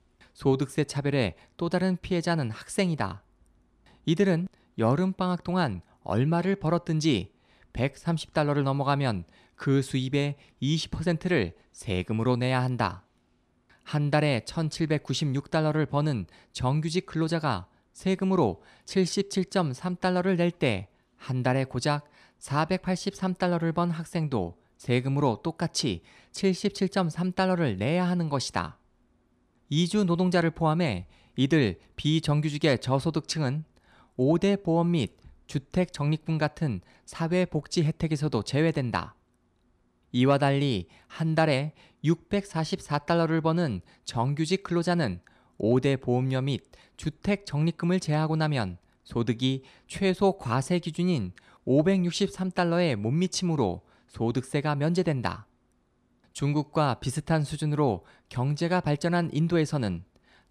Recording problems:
none

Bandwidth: 15 kHz